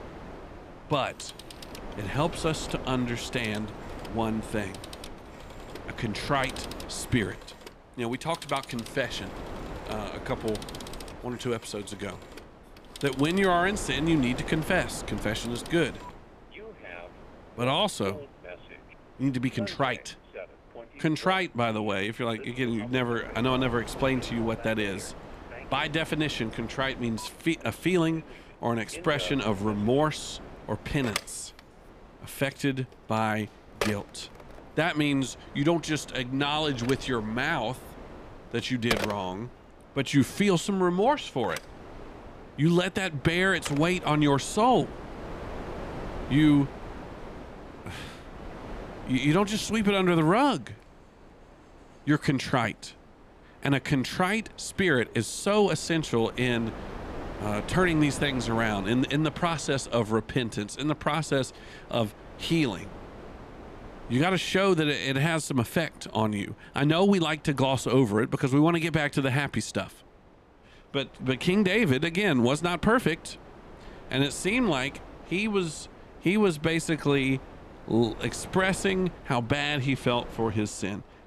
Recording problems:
alarms or sirens; noticeable; throughout; 15 dB below the speech
wind noise on the microphone; occasional gusts; 15 dB below the speech

